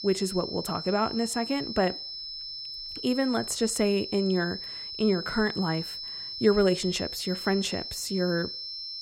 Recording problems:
high-pitched whine; loud; throughout; 5.5 kHz, 7 dB below the speech

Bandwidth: 16 kHz